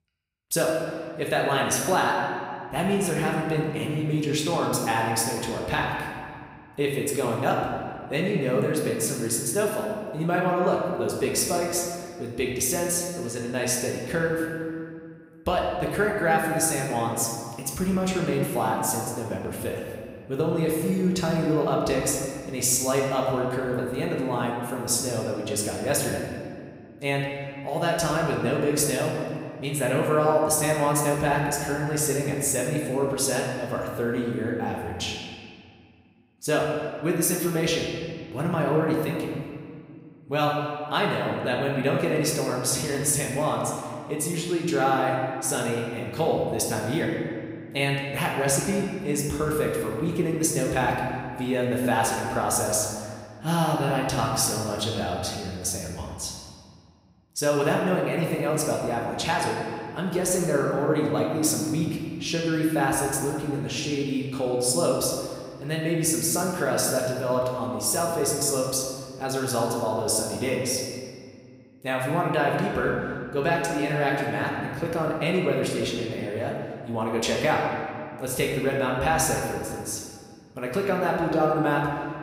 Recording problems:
room echo; noticeable; dies away in 1.8 s
off-mic speech; somewhat distant

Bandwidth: 15.5 kHz